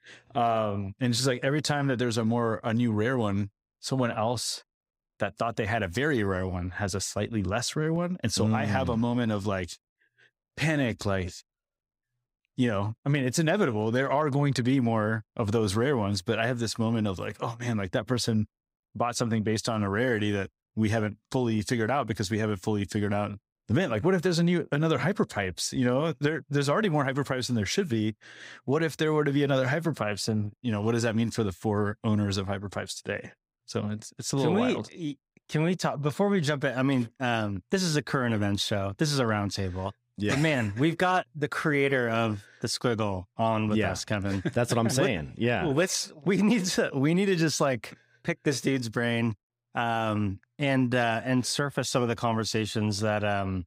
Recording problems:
none

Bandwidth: 15.5 kHz